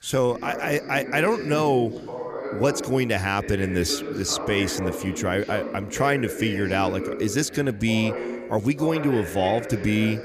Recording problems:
background chatter; loud; throughout; 2 voices, 8 dB below the speech

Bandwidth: 15 kHz